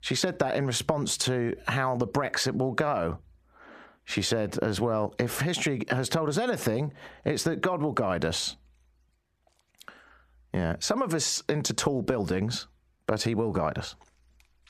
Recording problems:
squashed, flat; heavily

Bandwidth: 14.5 kHz